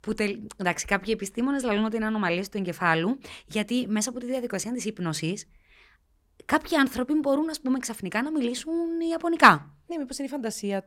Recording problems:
none

